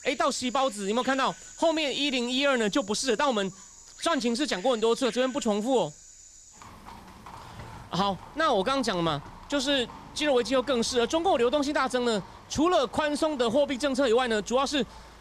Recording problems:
animal sounds; noticeable; throughout; 20 dB below the speech

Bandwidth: 15 kHz